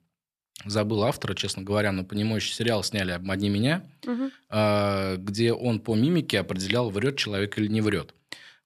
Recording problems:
none

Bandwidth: 14.5 kHz